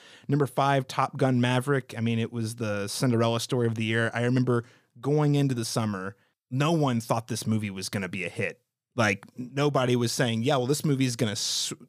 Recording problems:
none

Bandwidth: 15 kHz